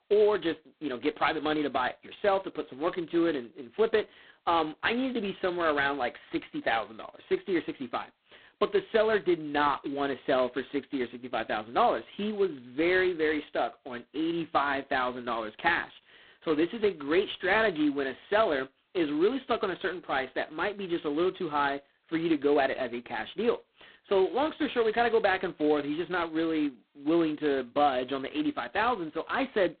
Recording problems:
phone-call audio; poor line; nothing above 4 kHz

